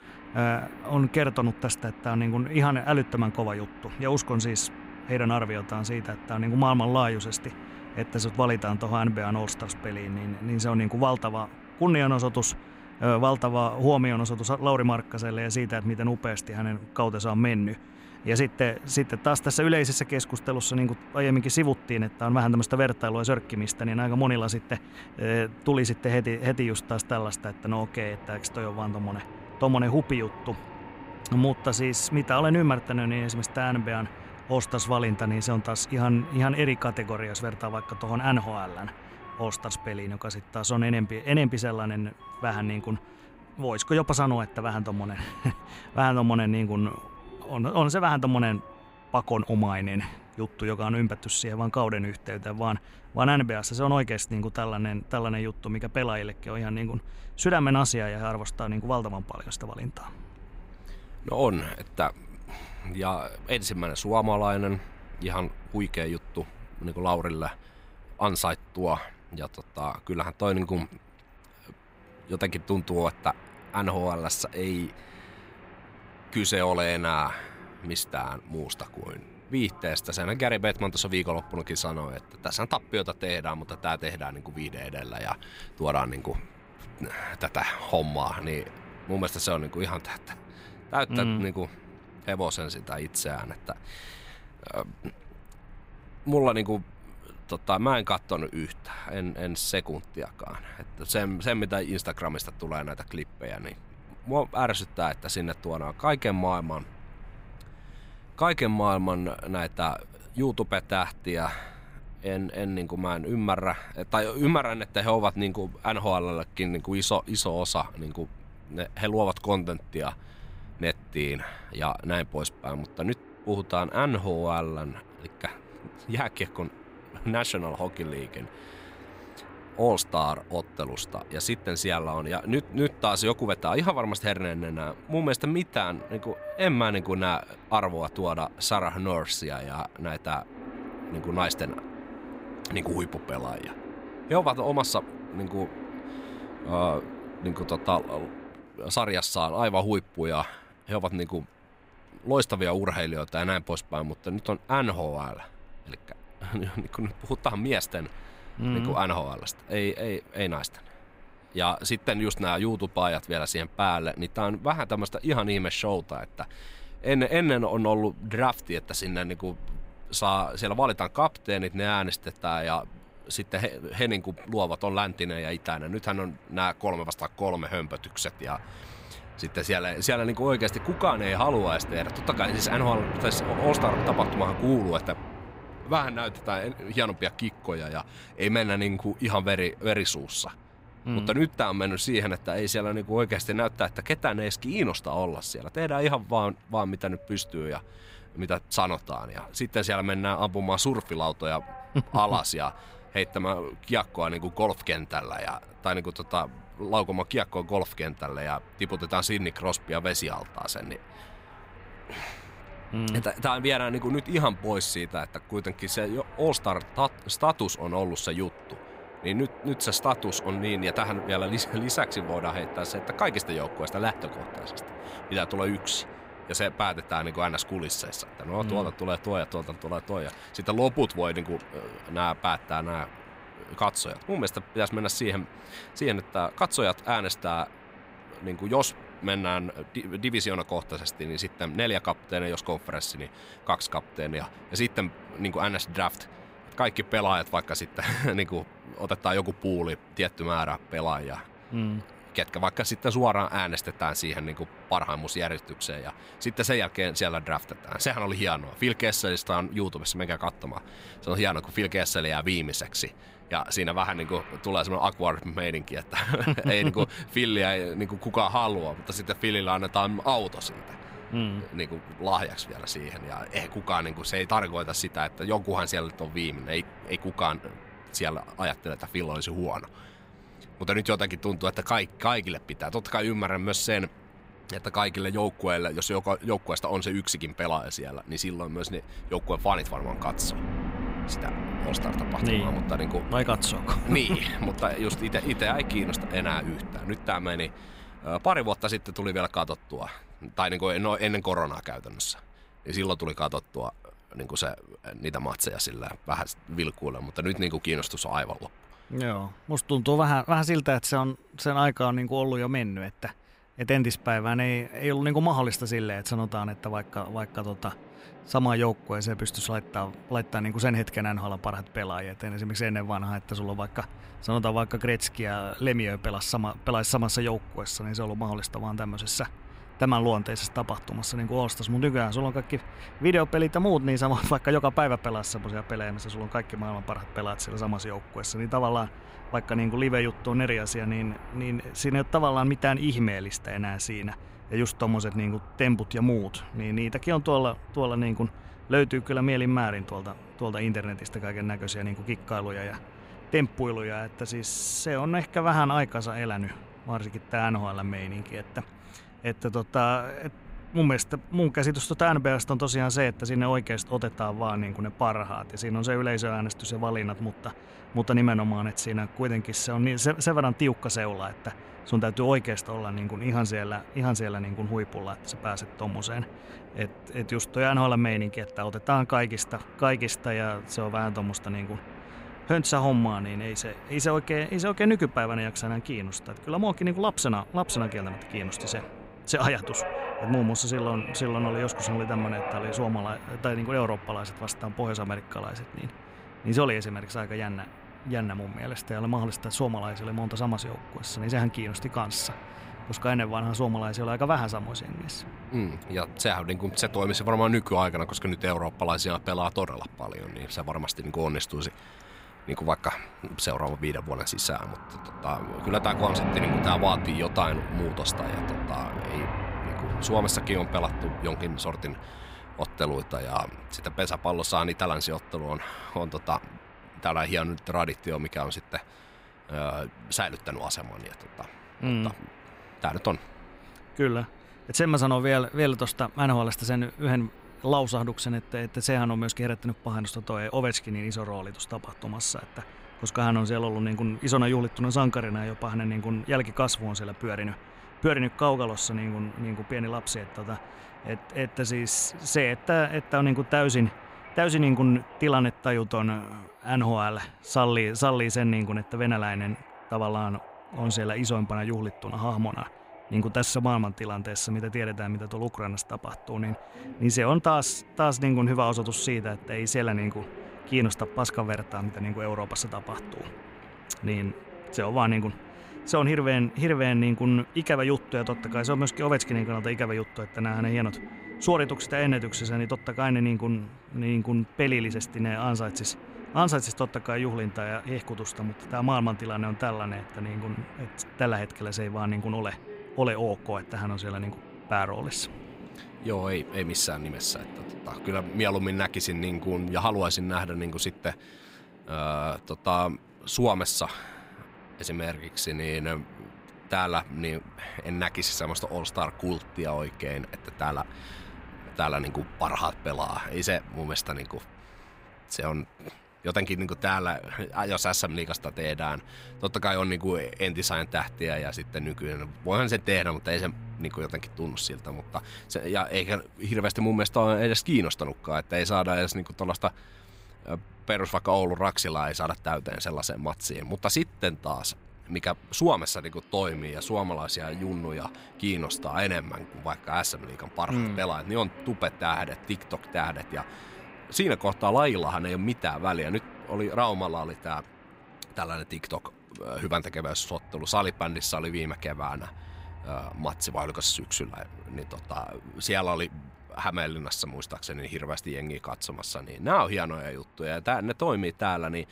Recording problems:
train or aircraft noise; noticeable; throughout; 15 dB below the speech

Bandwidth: 15.5 kHz